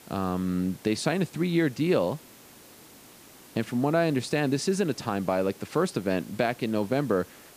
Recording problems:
hiss; faint; throughout; 20 dB below the speech

